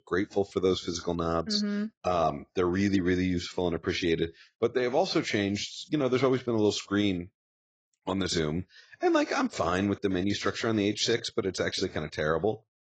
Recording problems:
garbled, watery; badly; nothing above 7.5 kHz

